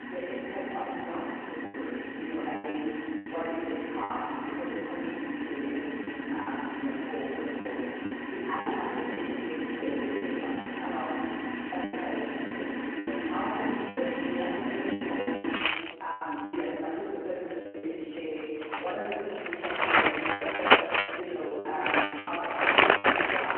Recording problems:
room echo; strong; dies away in 2.2 s
off-mic speech; far
phone-call audio
household noises; very loud; throughout; 5 dB above the speech
choppy; very; 9% of the speech affected

